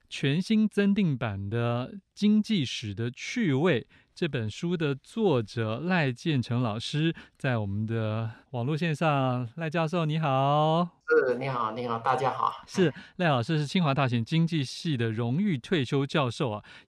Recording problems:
none

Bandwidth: 14 kHz